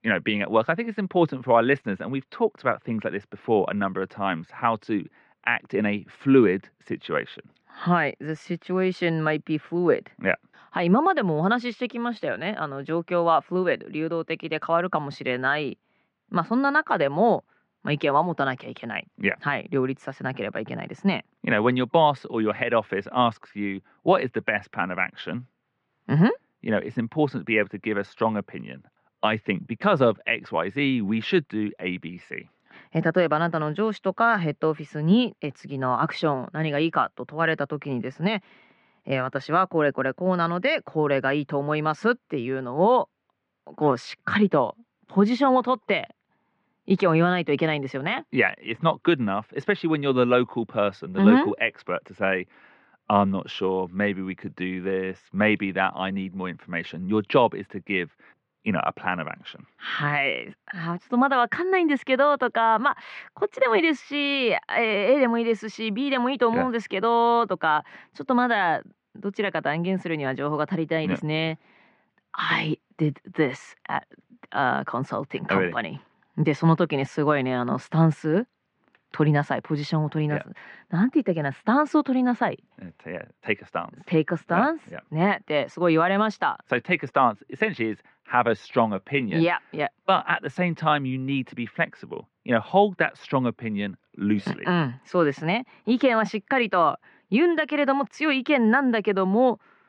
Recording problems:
muffled; very; fading above 2.5 kHz

